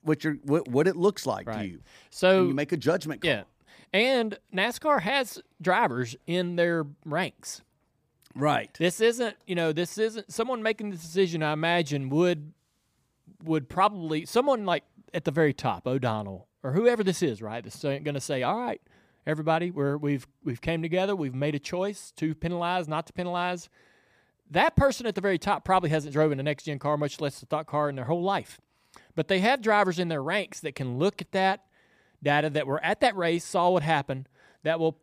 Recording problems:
none

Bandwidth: 15 kHz